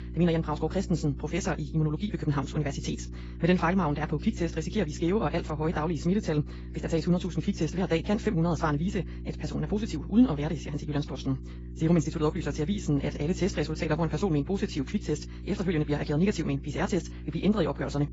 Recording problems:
garbled, watery; badly; nothing above 7.5 kHz
wrong speed, natural pitch; too fast; 1.8 times normal speed
electrical hum; noticeable; throughout; 60 Hz, 20 dB below the speech

